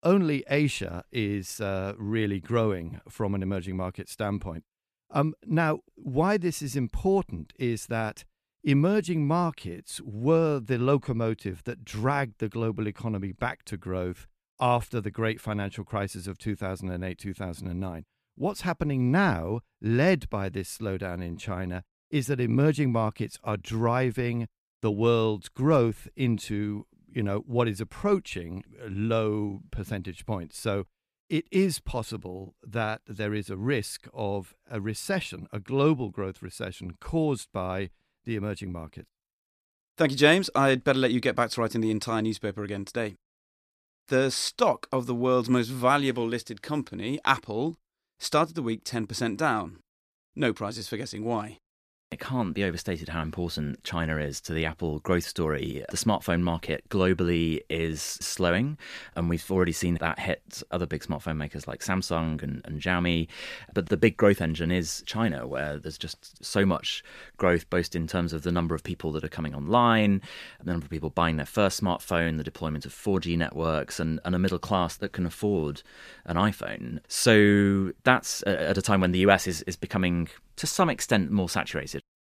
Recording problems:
none

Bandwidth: 14.5 kHz